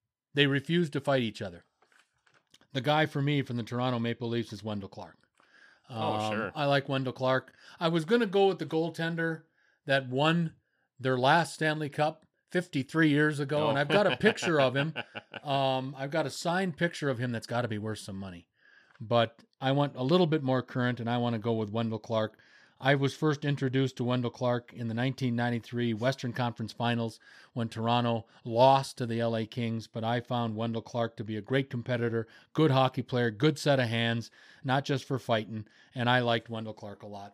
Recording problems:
none

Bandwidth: 15 kHz